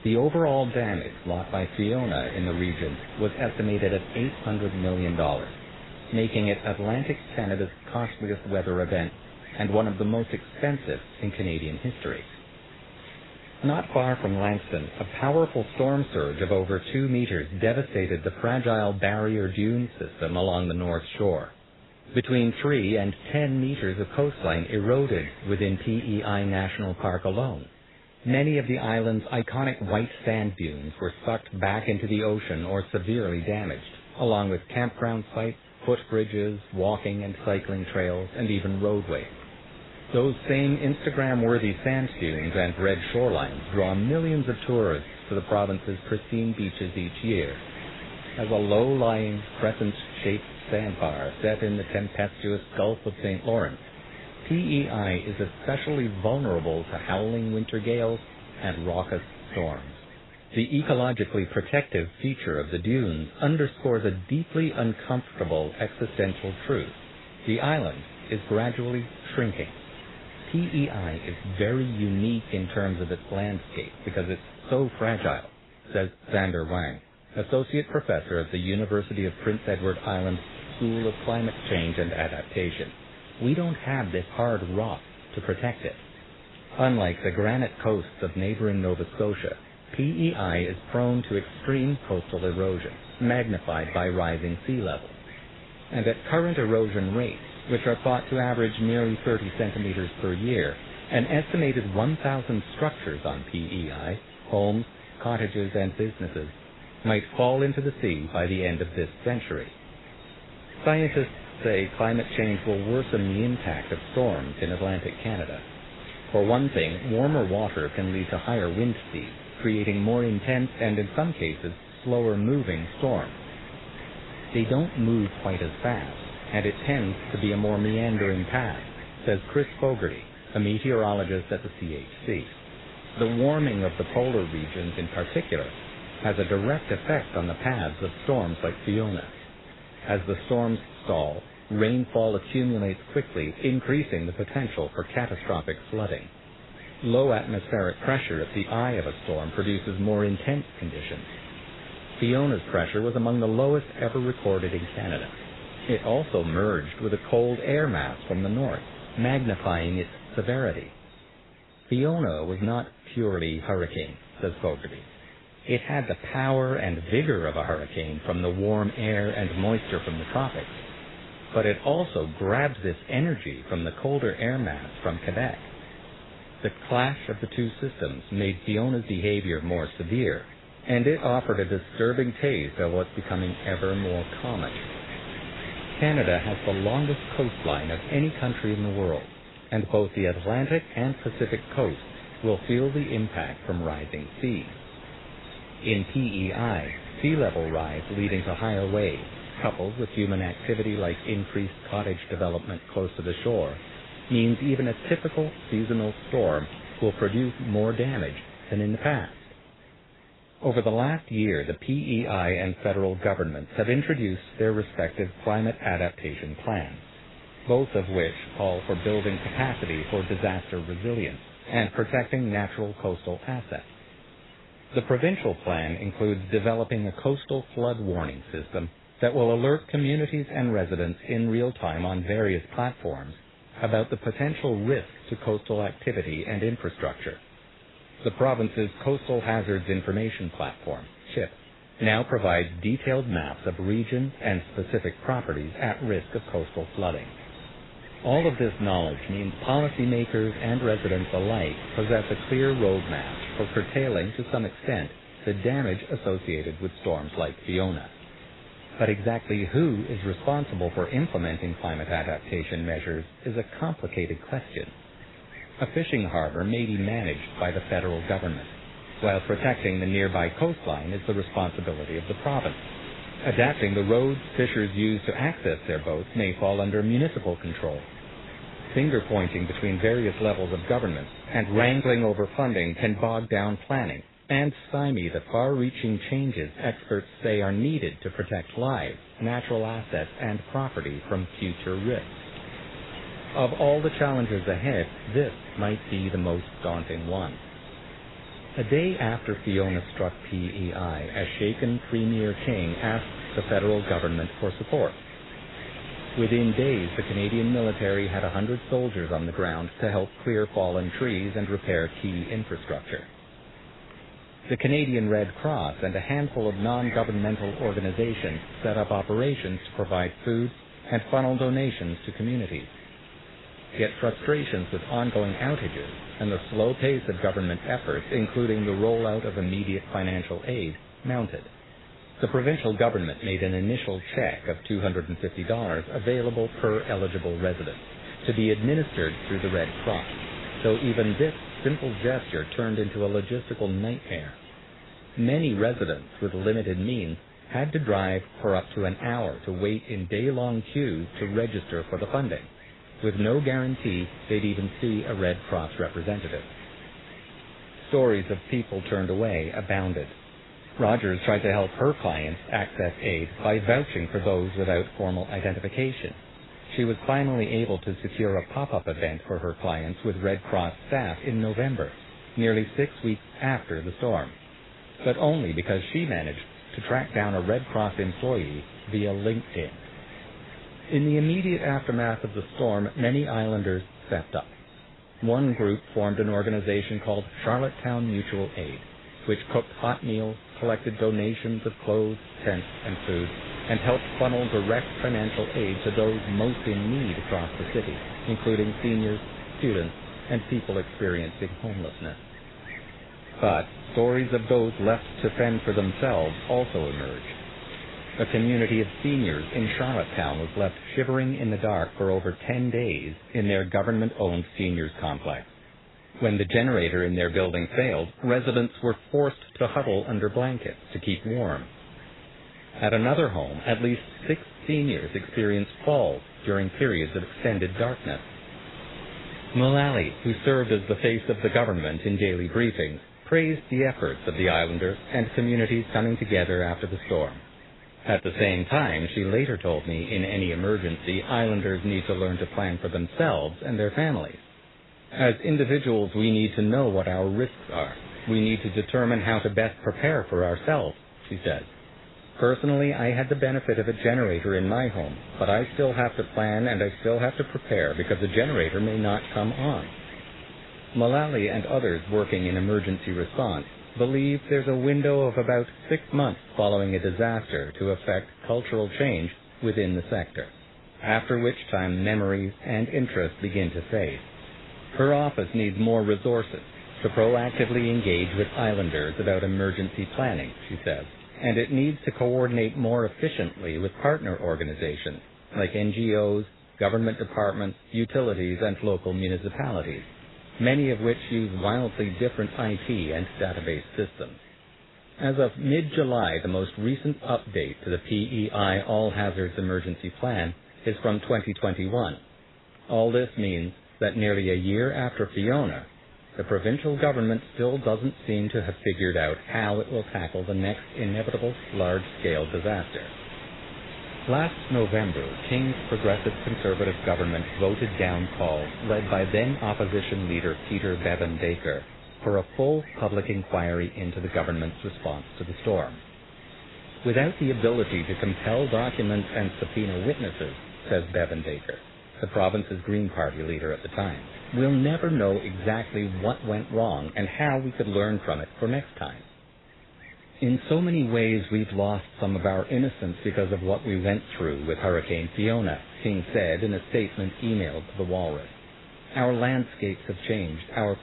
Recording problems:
garbled, watery; badly; nothing above 4 kHz
wind noise on the microphone; occasional gusts; 15 dB below the speech

